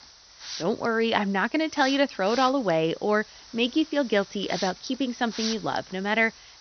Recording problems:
high frequencies cut off; noticeable; nothing above 6 kHz
hiss; noticeable; throughout; 15 dB below the speech

